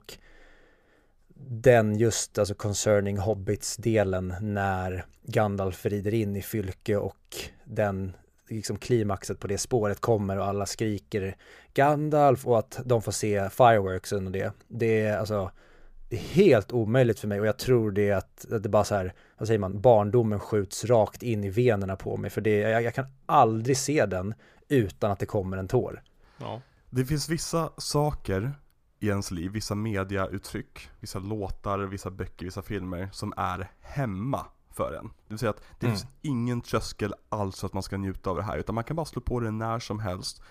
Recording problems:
none

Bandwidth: 15 kHz